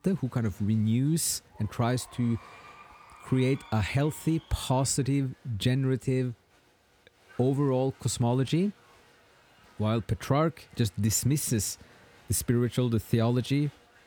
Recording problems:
crowd noise; faint; throughout; 25 dB below the speech

